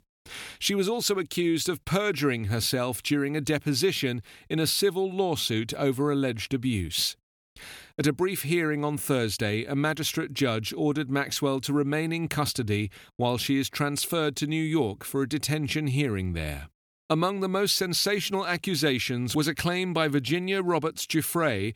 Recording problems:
none

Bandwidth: 18.5 kHz